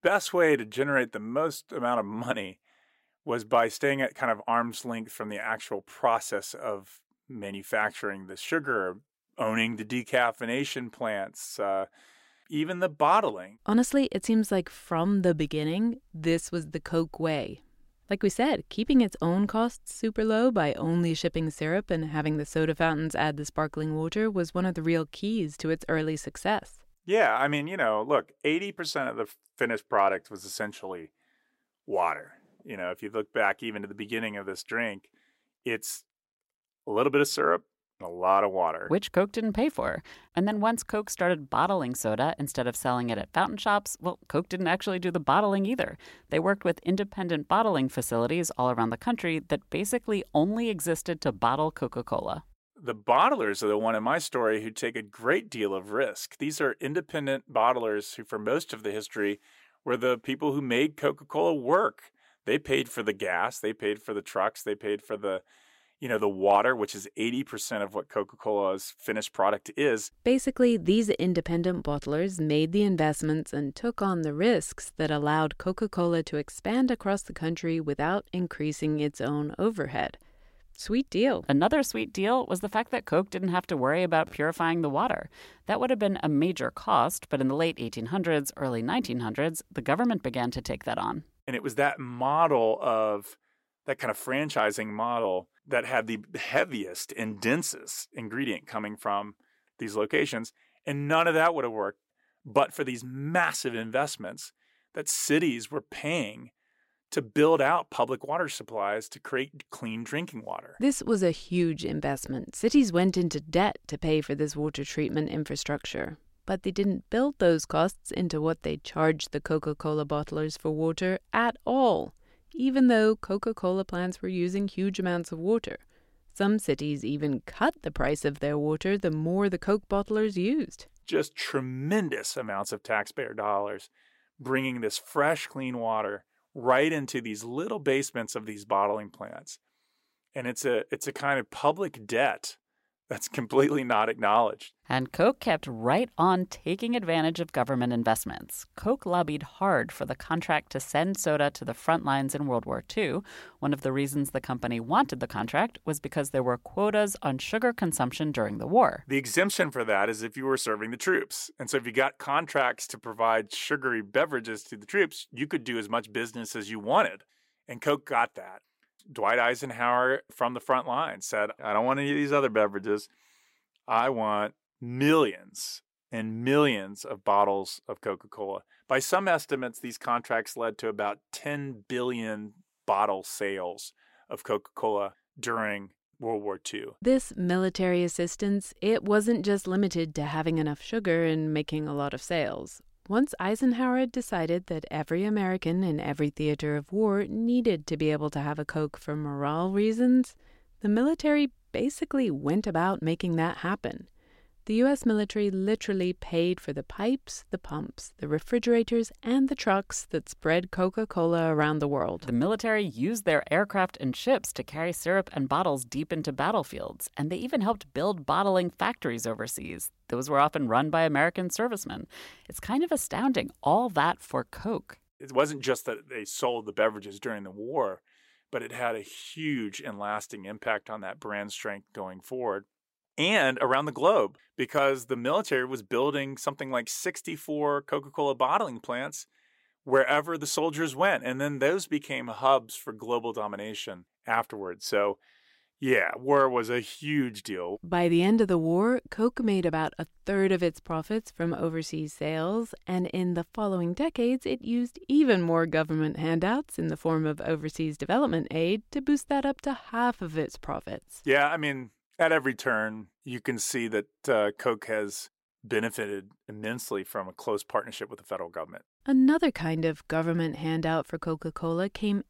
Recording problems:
none

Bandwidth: 16 kHz